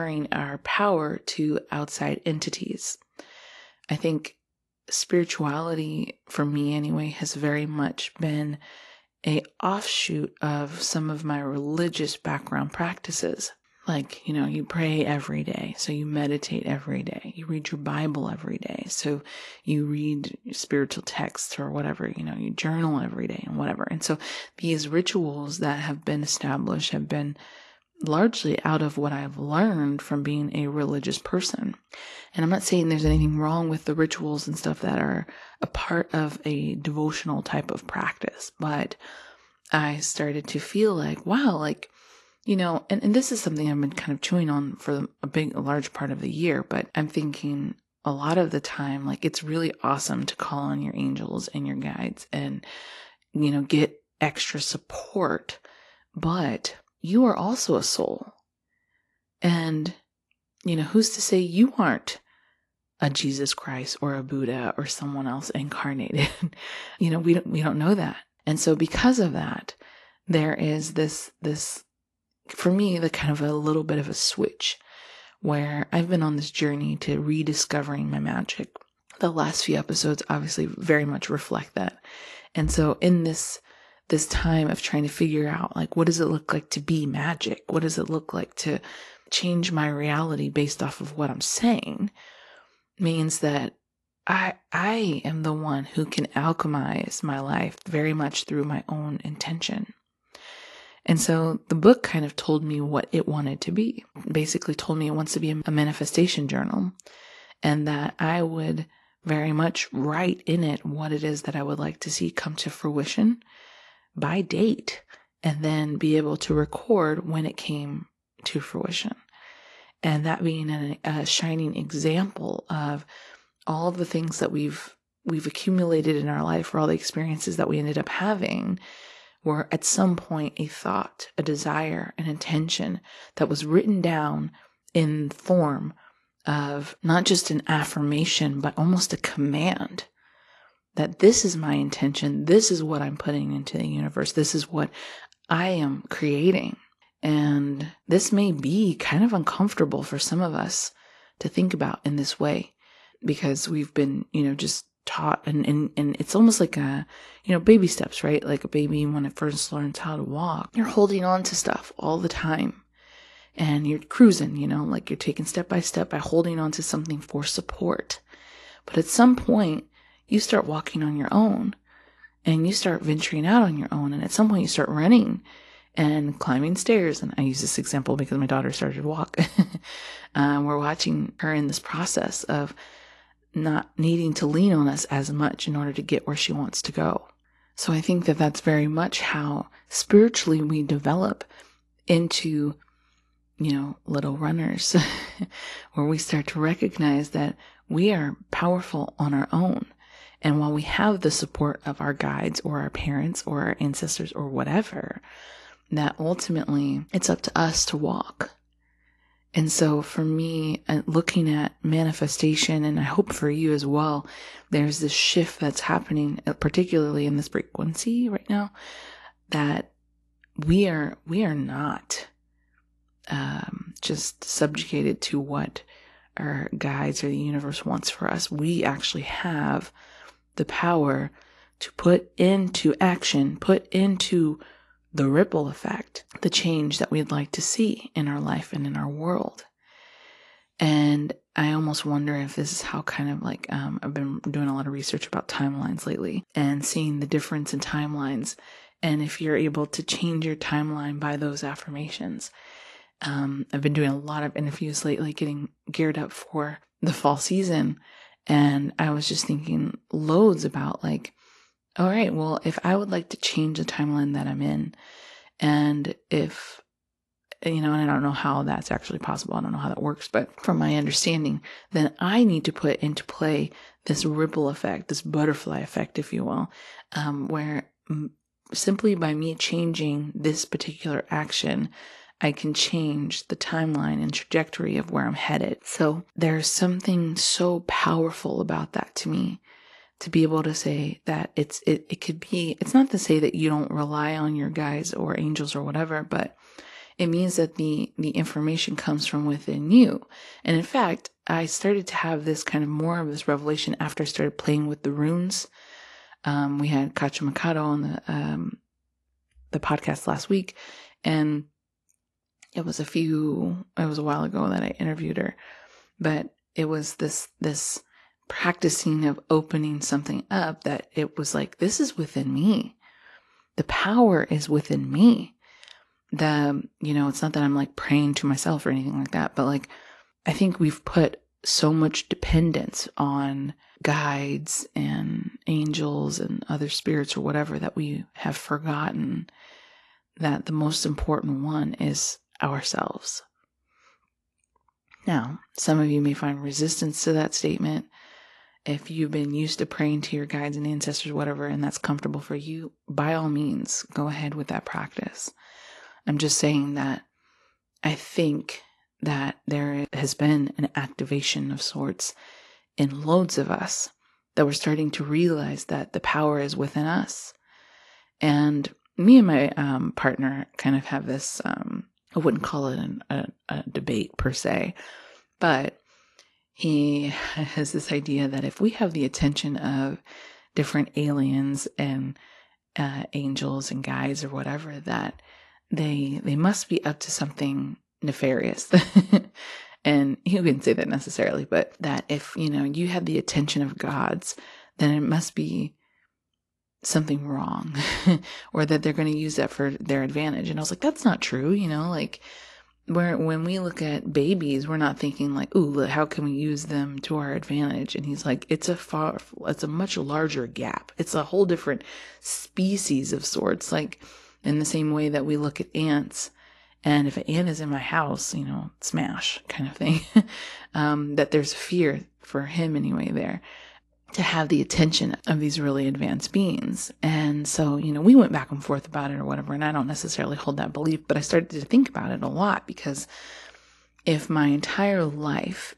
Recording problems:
garbled, watery; slightly; nothing above 11.5 kHz
abrupt cut into speech; at the start

